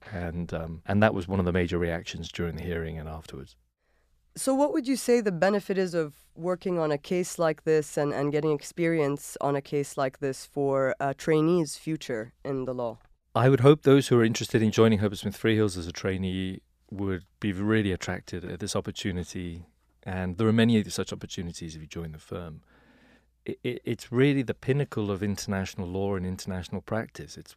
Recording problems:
none

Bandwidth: 14.5 kHz